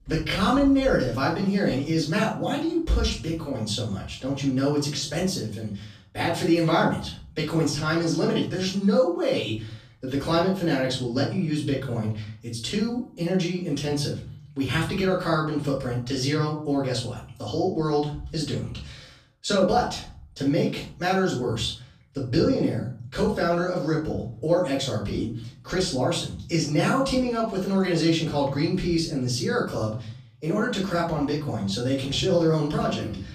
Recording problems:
off-mic speech; far
room echo; noticeable; dies away in 0.5 s

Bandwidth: 14.5 kHz